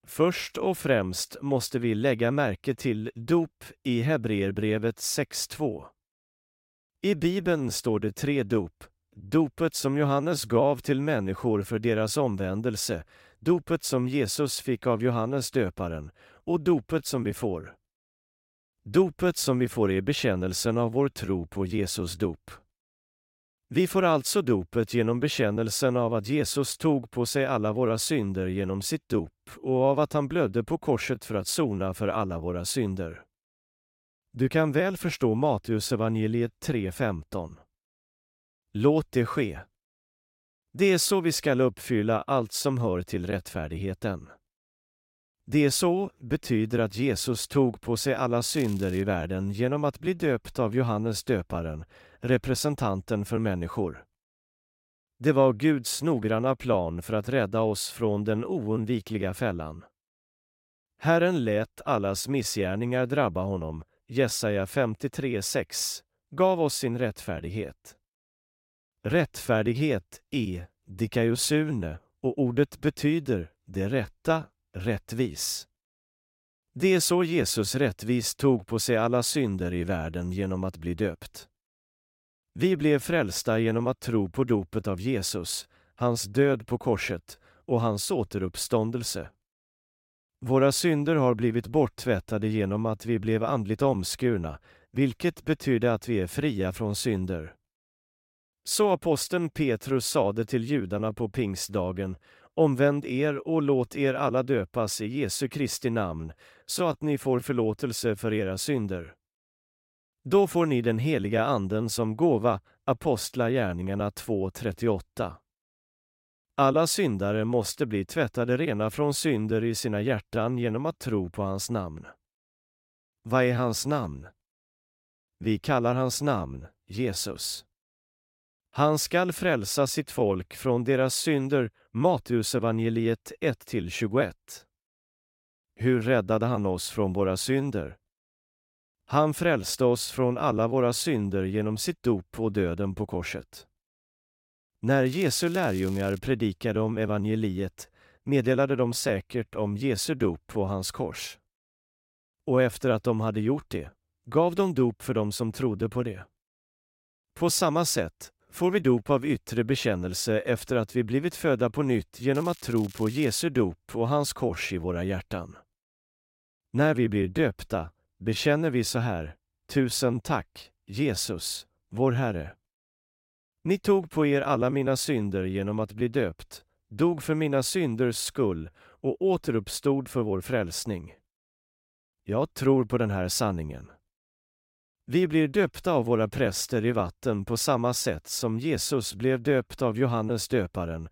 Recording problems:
crackling; faint; at 49 s, from 2:25 to 2:26 and from 2:42 to 2:43; 20 dB below the speech

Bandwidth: 16 kHz